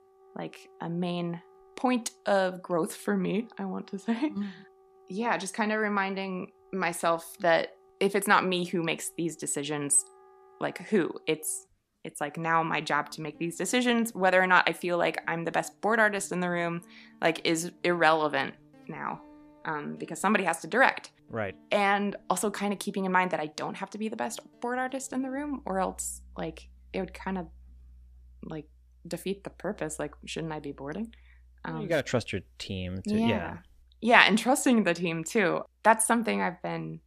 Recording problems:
background music; faint; throughout; 30 dB below the speech

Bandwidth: 14.5 kHz